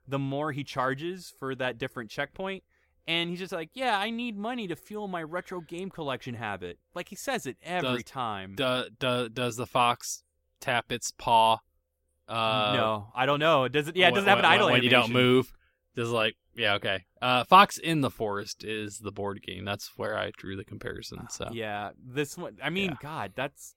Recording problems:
none

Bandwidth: 16.5 kHz